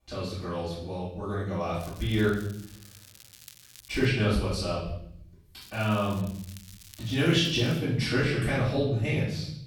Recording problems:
off-mic speech; far
room echo; noticeable; dies away in 0.8 s
crackling; faint; from 2 to 4 s and from 5.5 to 8 s; 20 dB below the speech

